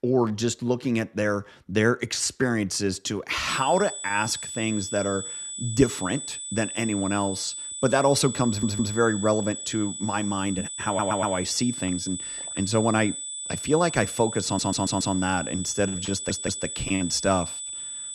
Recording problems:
high-pitched whine; loud; from 3.5 s on; 8 kHz, 6 dB below the speech
audio stuttering; 4 times, first at 8.5 s

